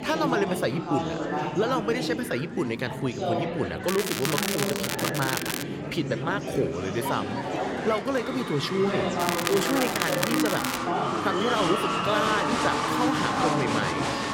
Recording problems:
murmuring crowd; very loud; throughout; as loud as the speech
crackling; loud; from 4 to 5.5 s and from 9 to 11 s; 1 dB below the speech
animal sounds; very faint; throughout; 25 dB below the speech

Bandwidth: 16.5 kHz